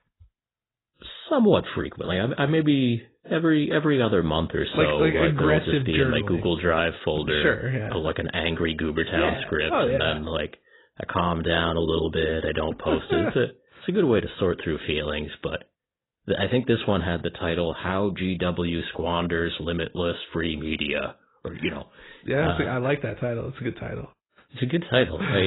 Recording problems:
garbled, watery; badly; nothing above 4 kHz
abrupt cut into speech; at the end

